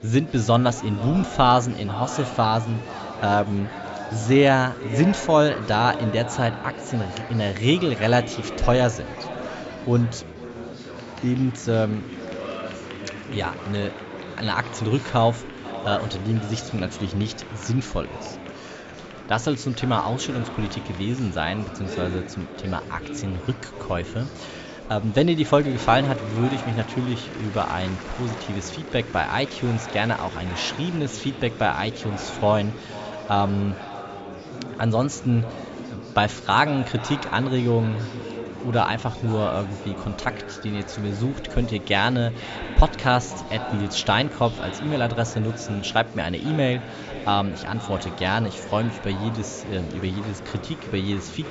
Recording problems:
echo of what is said; noticeable; throughout; 490 ms later, 15 dB below the speech
high frequencies cut off; noticeable; nothing above 8 kHz
murmuring crowd; noticeable; throughout; 15 dB below the speech

